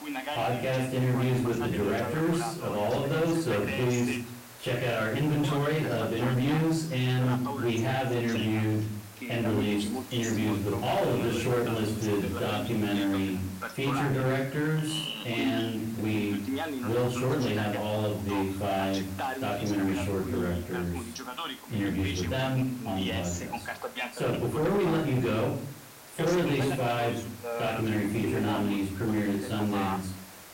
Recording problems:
off-mic speech; far
room echo; slight; dies away in 0.5 s
distortion; slight; 10 dB below the speech
voice in the background; loud; throughout; 8 dB below the speech
hiss; noticeable; throughout; 15 dB below the speech

